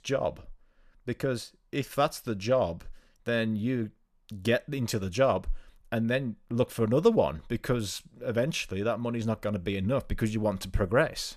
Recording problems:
none

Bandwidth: 14.5 kHz